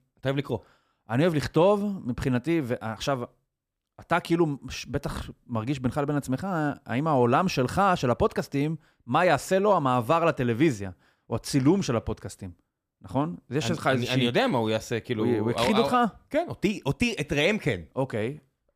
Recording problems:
none

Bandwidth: 15 kHz